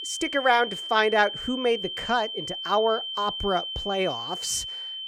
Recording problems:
high-pitched whine; loud; throughout; 3 kHz, 6 dB below the speech

